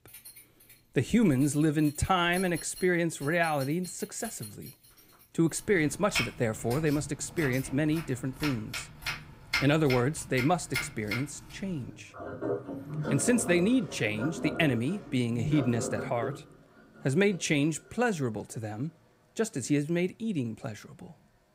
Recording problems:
household noises; loud; throughout; 9 dB below the speech

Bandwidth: 15.5 kHz